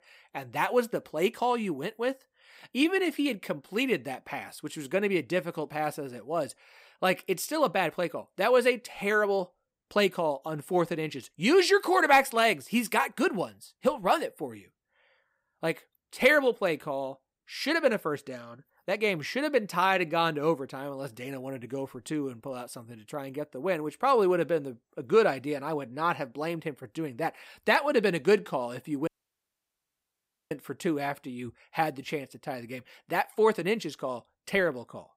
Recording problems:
audio cutting out; at 29 s for 1.5 s

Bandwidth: 15.5 kHz